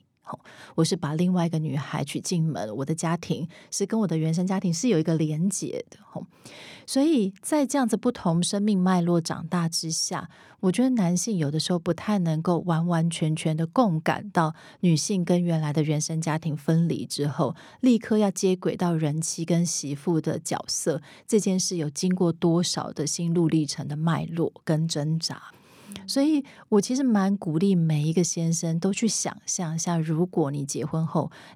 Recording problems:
none

